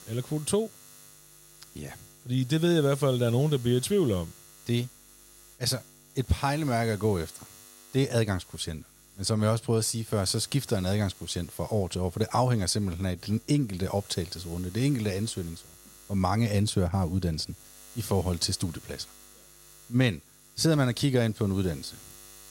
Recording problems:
electrical hum; faint; throughout; 50 Hz, 20 dB below the speech

